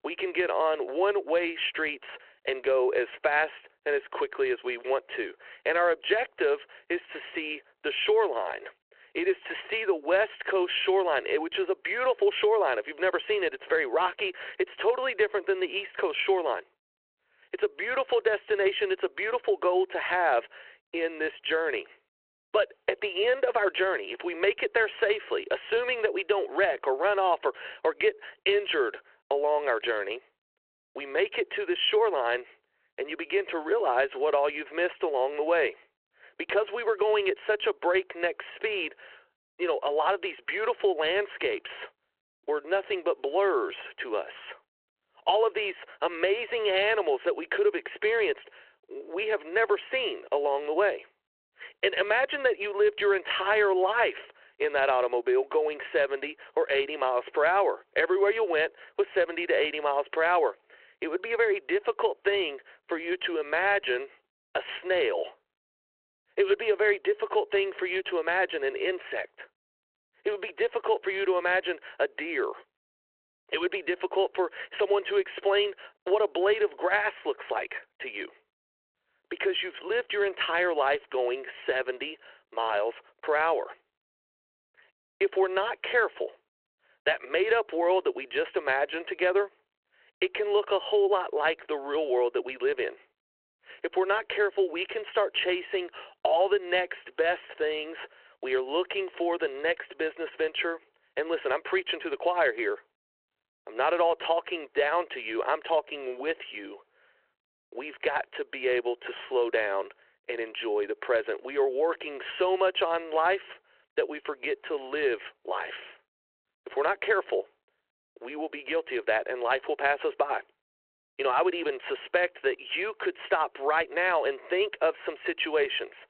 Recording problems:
phone-call audio

